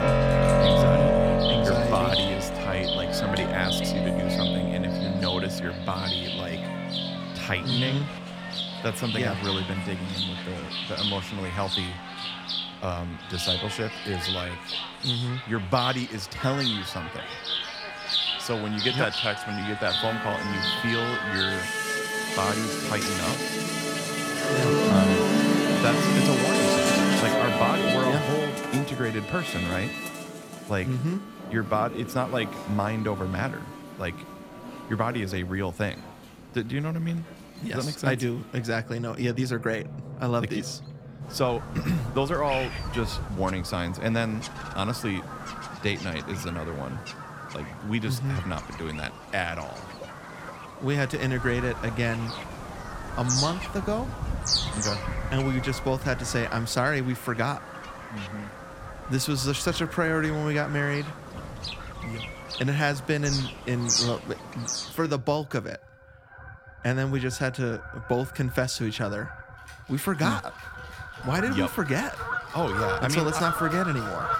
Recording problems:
background music; very loud; throughout; 2 dB above the speech
animal sounds; loud; throughout; 3 dB below the speech

